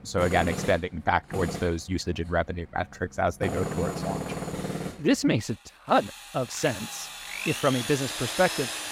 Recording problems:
machinery noise; loud; throughout; 6 dB below the speech
uneven, jittery; strongly; from 1 to 8 s

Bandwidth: 16 kHz